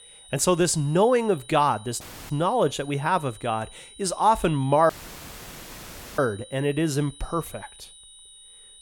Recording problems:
high-pitched whine; faint; throughout; 4 kHz, 20 dB below the speech
audio cutting out; filled with static; at 2 s and at 5 s for 1.5 s

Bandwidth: 17 kHz